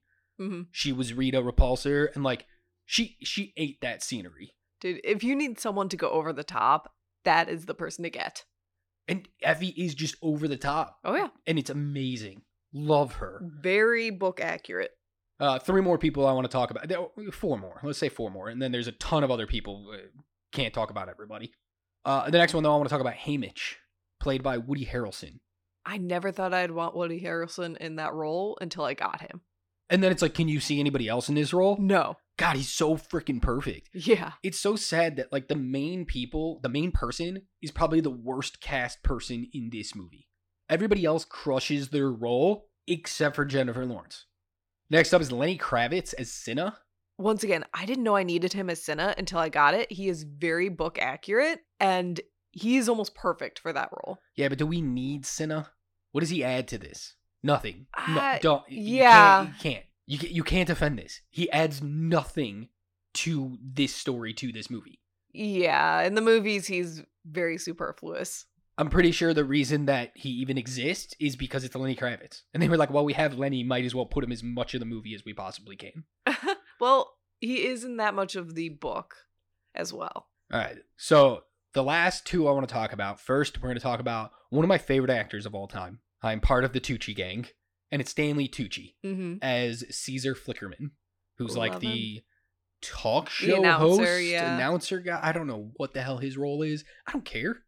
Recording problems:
uneven, jittery; strongly; from 10 s to 1:36

